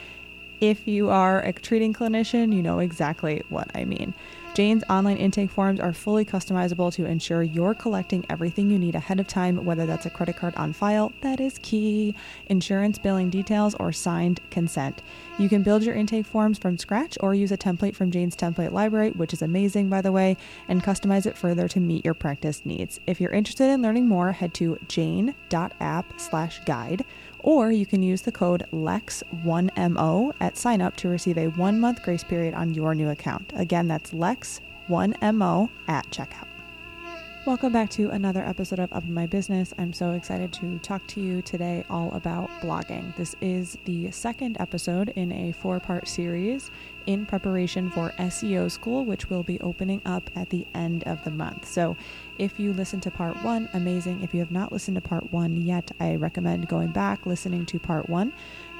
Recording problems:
electrical hum; noticeable; throughout; 60 Hz, 10 dB below the speech

